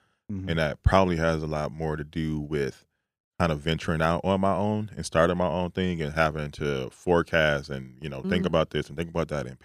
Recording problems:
none

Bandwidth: 15 kHz